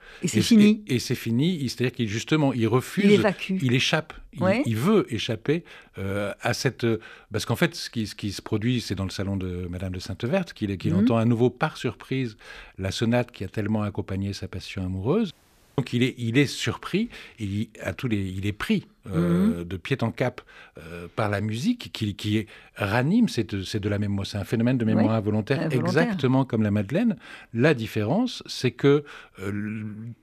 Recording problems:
audio cutting out; at 15 s

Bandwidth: 14.5 kHz